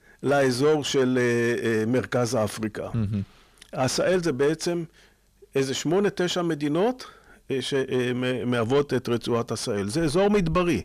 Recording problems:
distortion; slight; 10 dB below the speech

